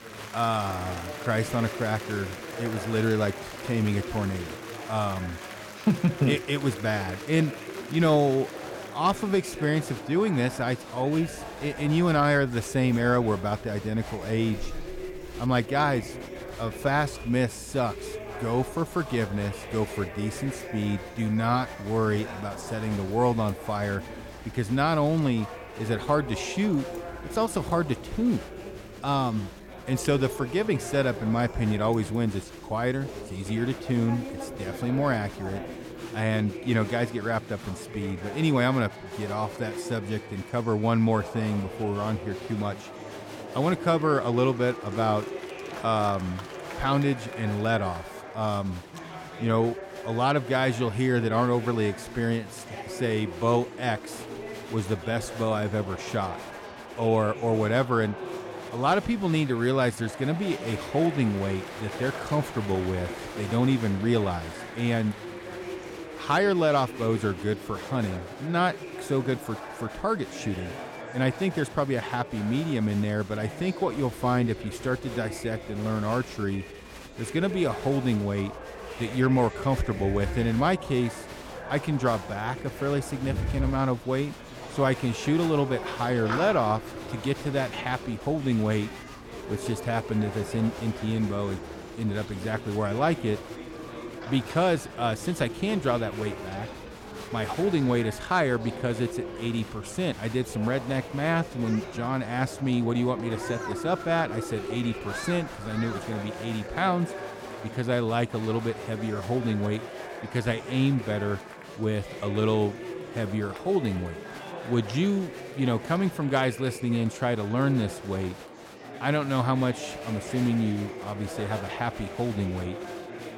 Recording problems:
murmuring crowd; noticeable; throughout; 10 dB below the speech

